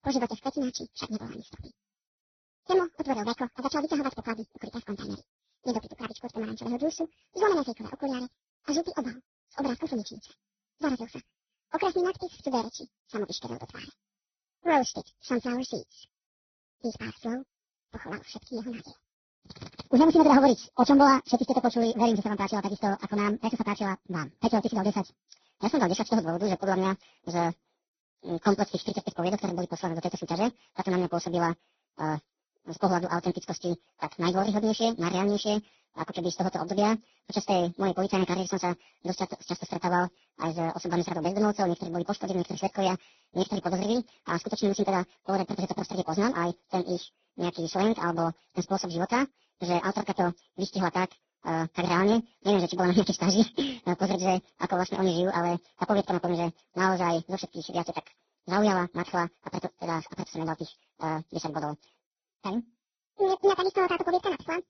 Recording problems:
garbled, watery; badly; nothing above 6 kHz
wrong speed and pitch; too fast and too high; 1.7 times normal speed

